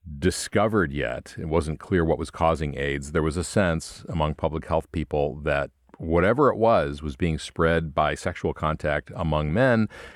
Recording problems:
muffled; slightly; fading above 3.5 kHz

